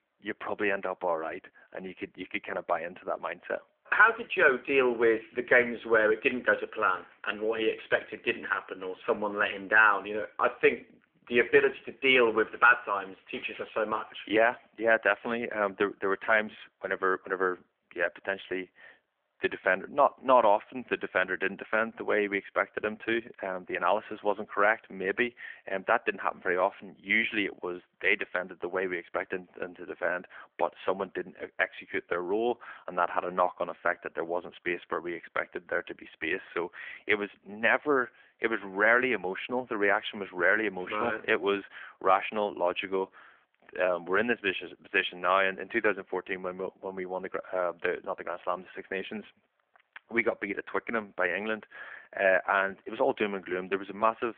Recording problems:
phone-call audio

